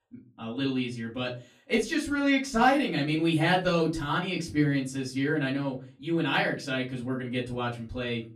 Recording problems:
off-mic speech; far
room echo; very slight; dies away in 0.3 s

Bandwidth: 15 kHz